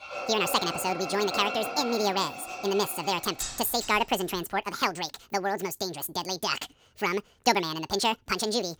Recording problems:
wrong speed and pitch; too fast and too high; 1.7 times normal speed
machinery noise; loud; until 3.5 s; 7 dB below the speech

